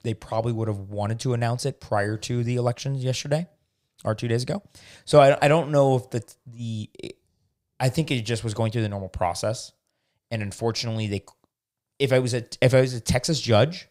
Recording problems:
none

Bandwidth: 15.5 kHz